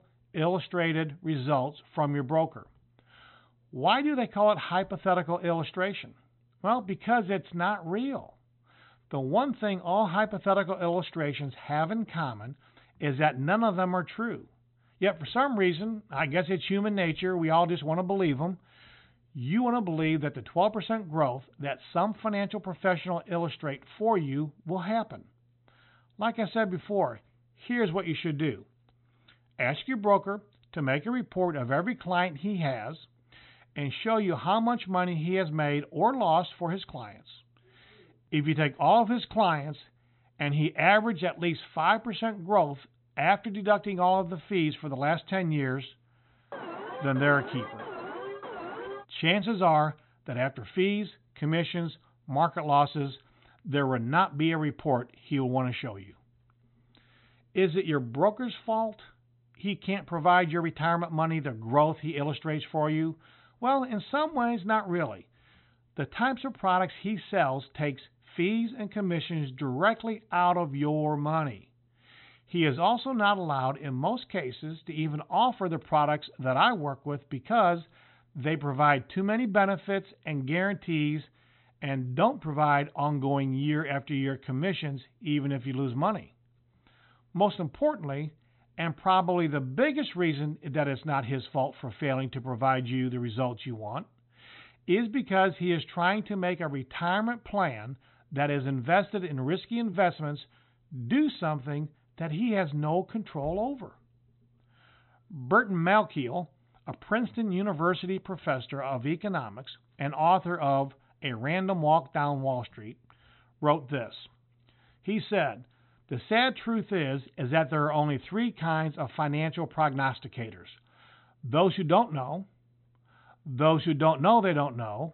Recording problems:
high frequencies cut off; severe; nothing above 4 kHz
alarm; noticeable; from 47 to 49 s; peak 10 dB below the speech

